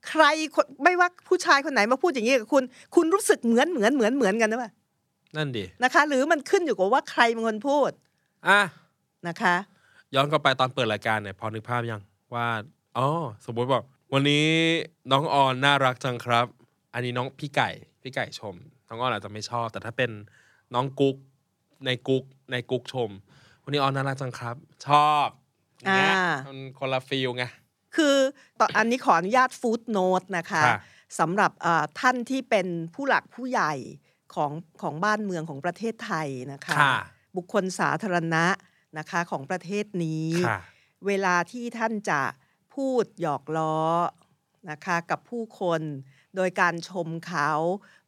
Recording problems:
none

